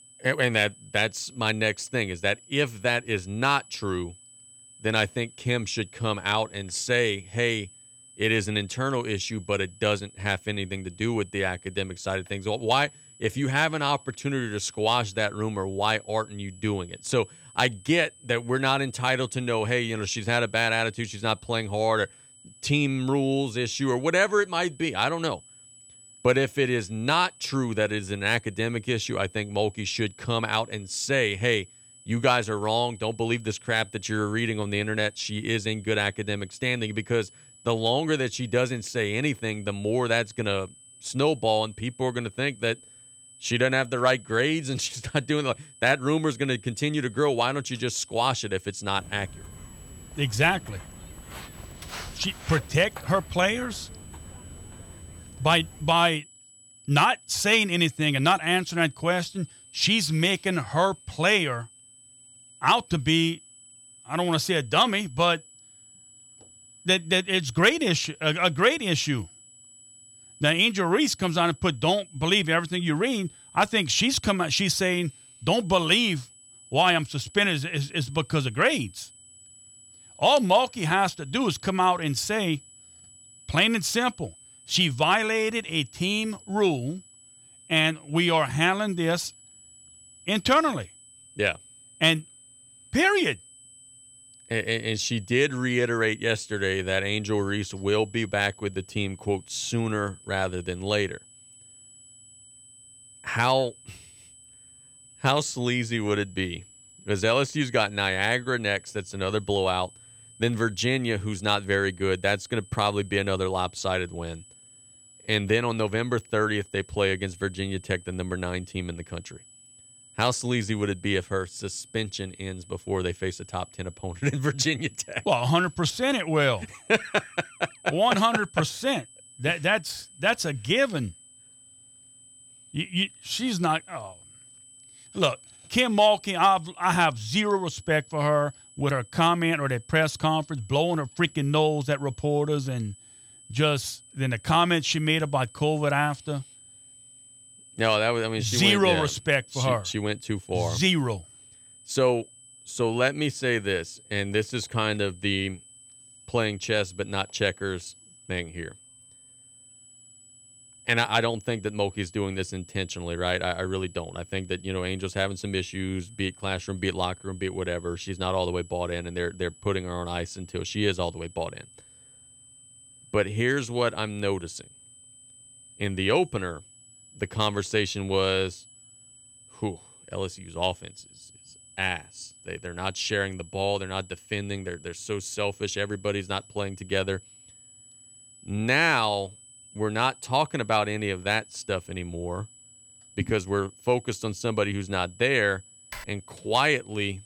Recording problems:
high-pitched whine; faint; throughout; 8 kHz, 25 dB below the speech
footsteps; faint; from 49 to 56 s; peak 10 dB below the speech
keyboard typing; faint; at 3:16; peak 15 dB below the speech

